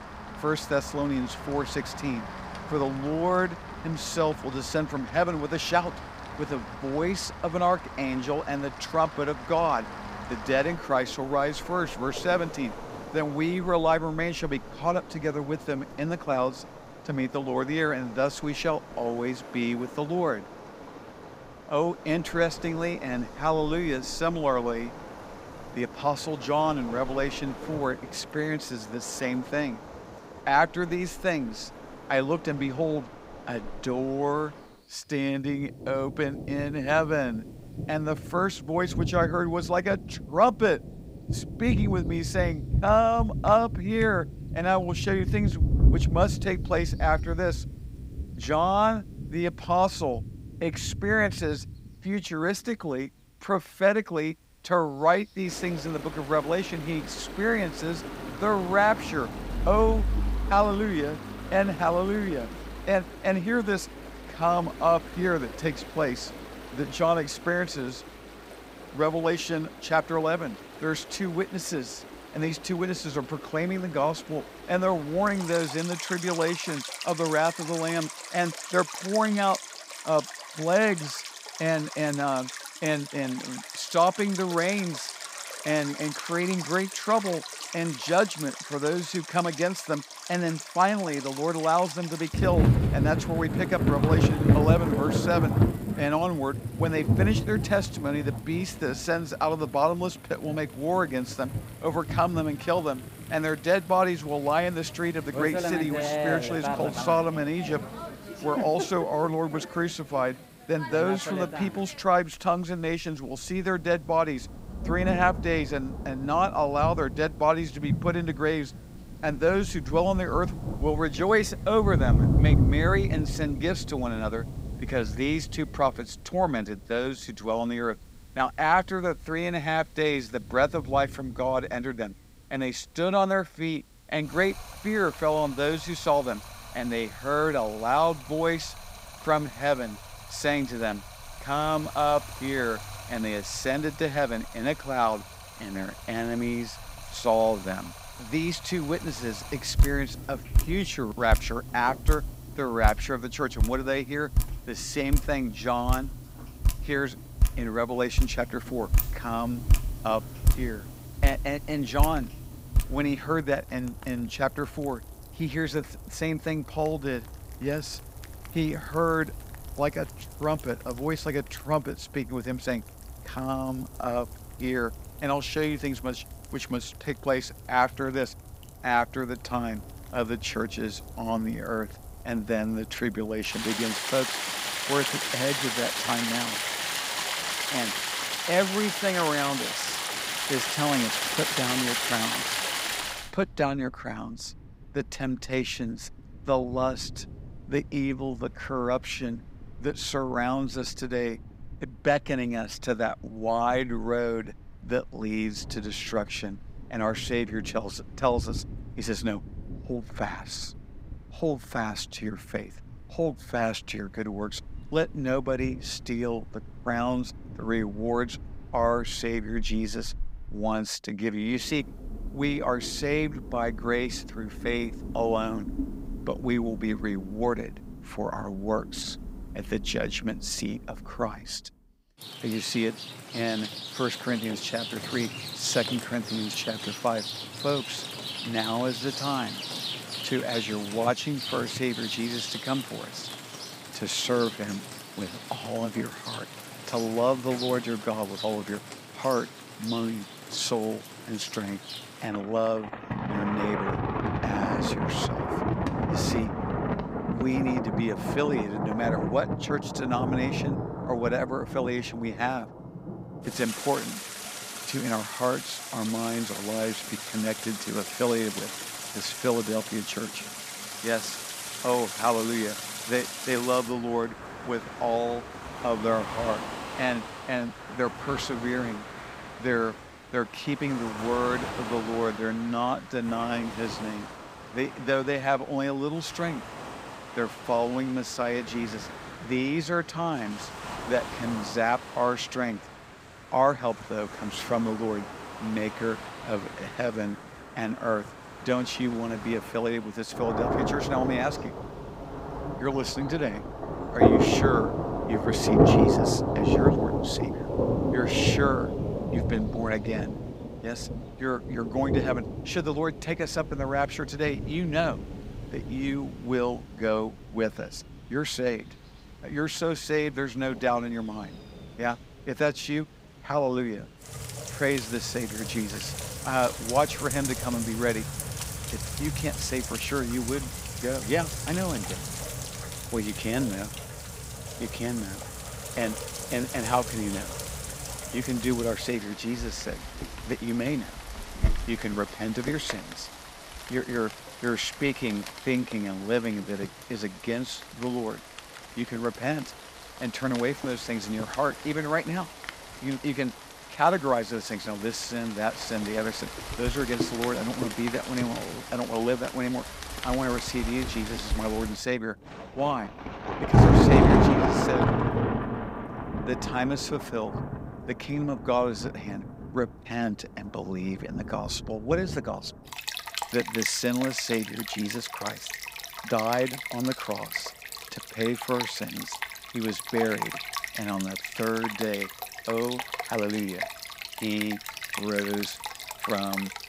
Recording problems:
rain or running water; loud; throughout; 4 dB below the speech

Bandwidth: 15.5 kHz